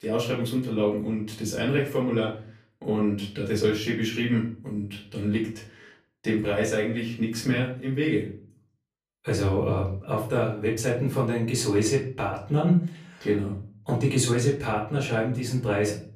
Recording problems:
off-mic speech; far
room echo; slight; dies away in 0.4 s

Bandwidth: 15 kHz